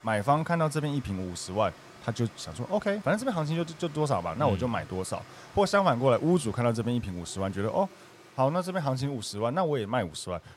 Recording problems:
rain or running water; faint; throughout; 20 dB below the speech

